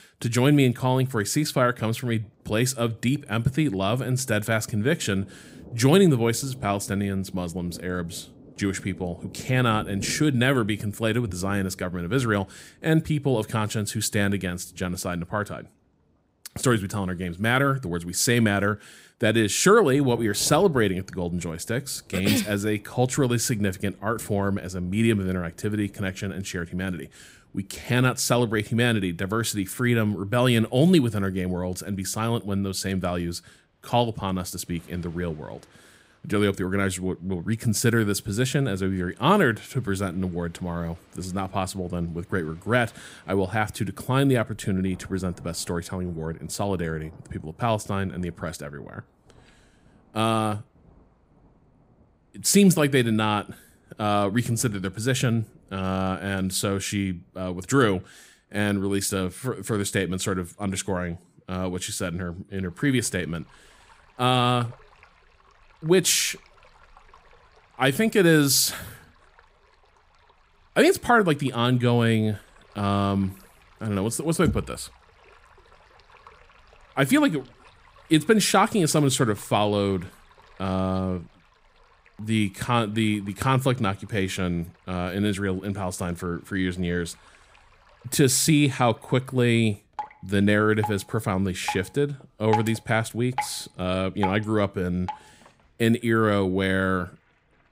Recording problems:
rain or running water; faint; throughout; 20 dB below the speech

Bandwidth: 15.5 kHz